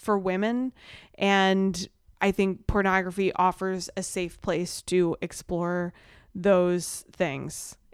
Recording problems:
none

